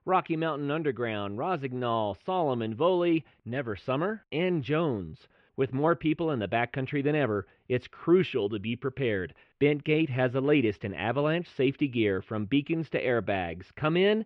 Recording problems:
muffled; very; fading above 2.5 kHz

